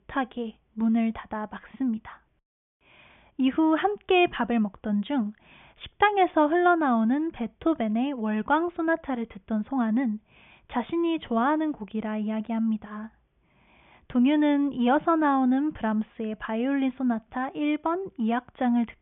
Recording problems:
high frequencies cut off; severe; nothing above 3.5 kHz

